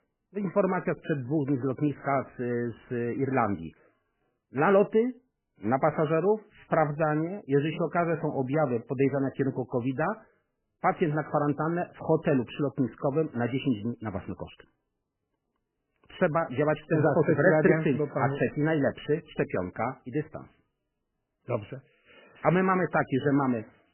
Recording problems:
garbled, watery; badly; nothing above 3 kHz

